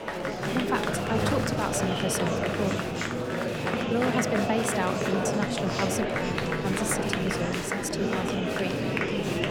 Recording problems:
murmuring crowd; very loud; throughout; 3 dB above the speech

